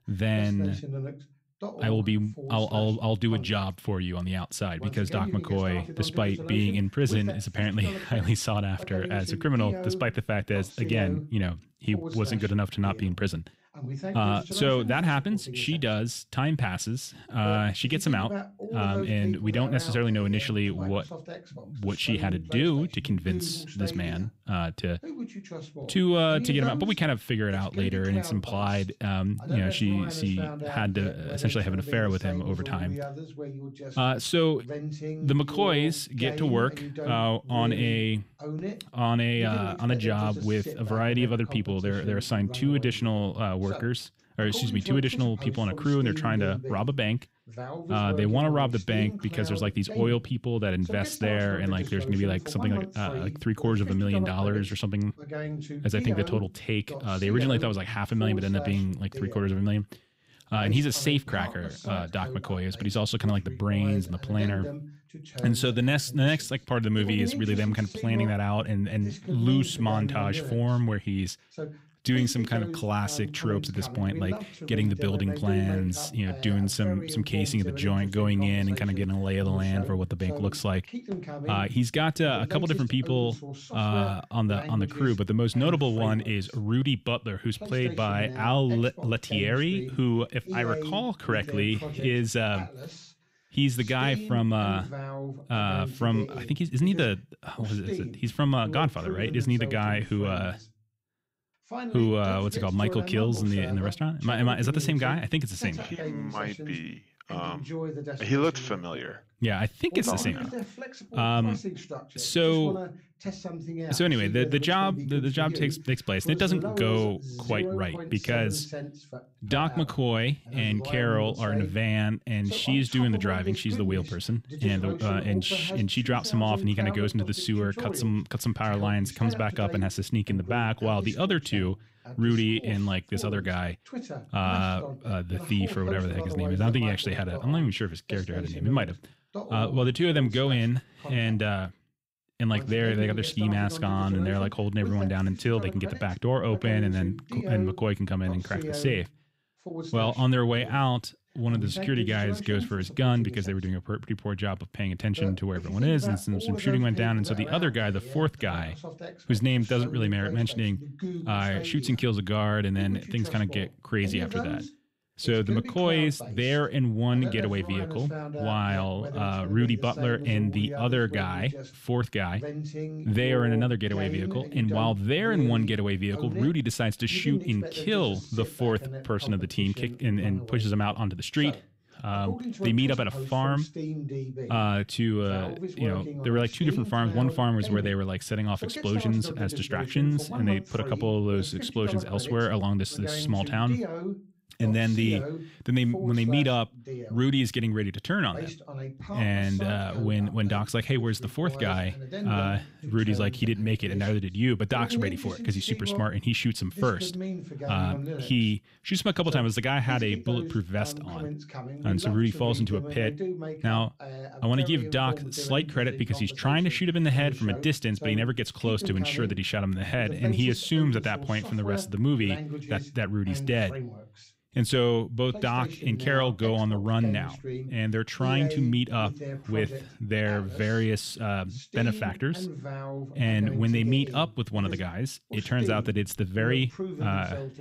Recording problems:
voice in the background; loud; throughout; 10 dB below the speech

